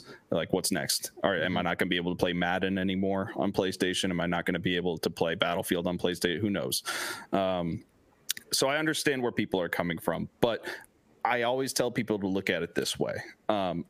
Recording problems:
squashed, flat; heavily

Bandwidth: 15 kHz